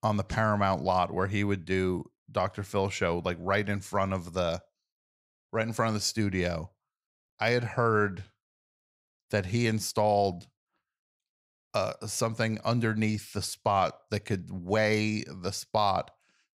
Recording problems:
none

